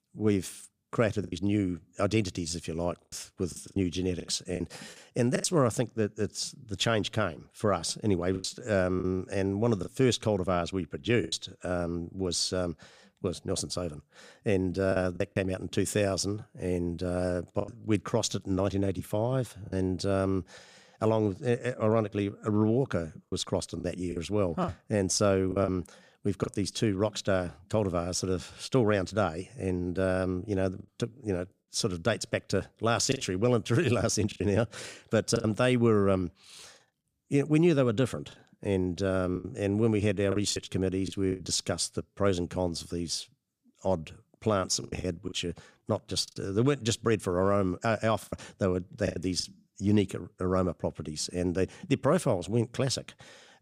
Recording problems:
choppy; occasionally; 5% of the speech affected

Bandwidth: 15 kHz